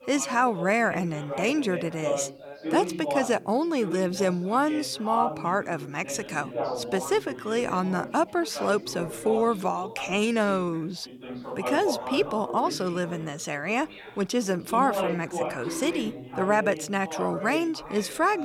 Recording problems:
background chatter; loud; throughout; 3 voices, 8 dB below the speech
abrupt cut into speech; at the end

